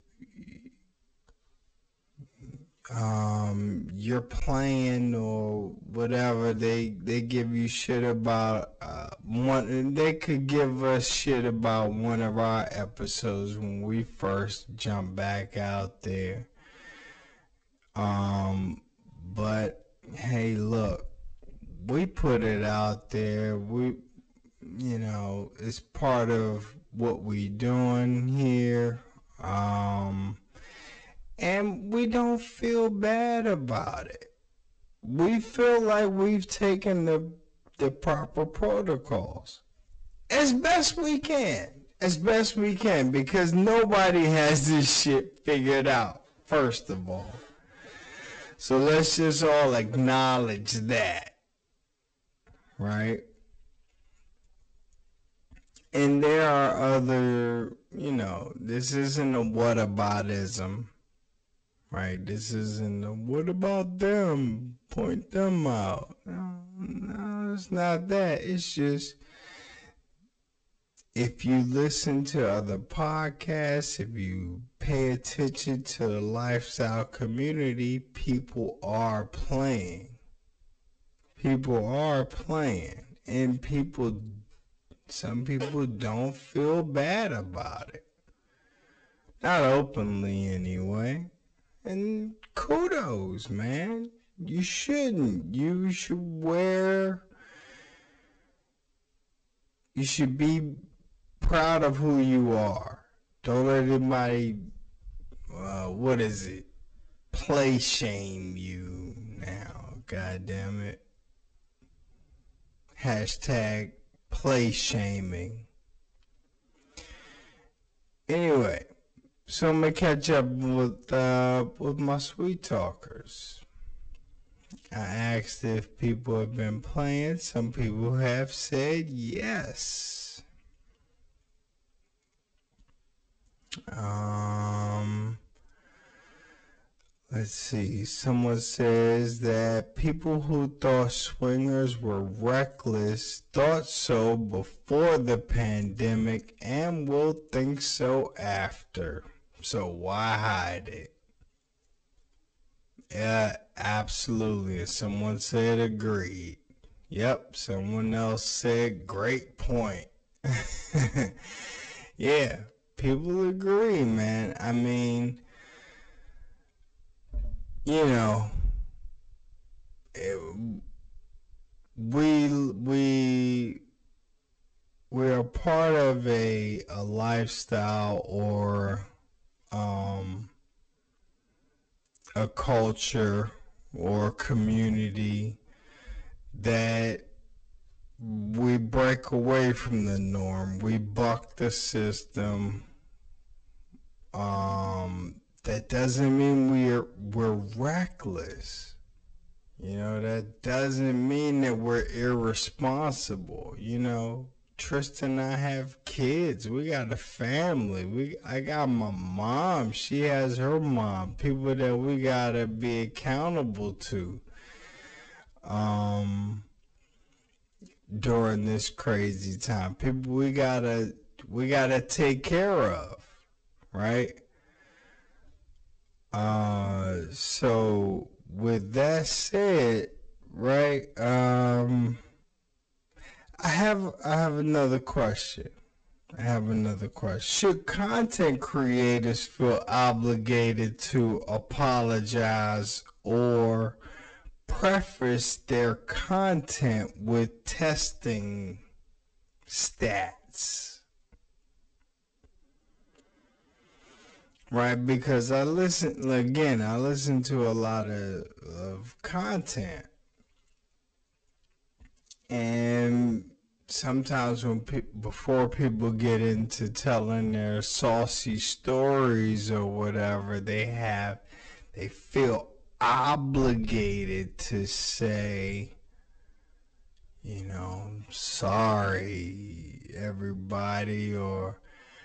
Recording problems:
wrong speed, natural pitch; too slow; 0.5 times normal speed
distortion; slight; 5% of the sound clipped
garbled, watery; slightly; nothing above 8 kHz

